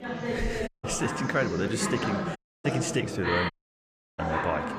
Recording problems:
chatter from many people; loud; throughout; 1 dB below the speech
audio cutting out; at 0.5 s, at 2.5 s and at 3.5 s for 0.5 s

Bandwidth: 15 kHz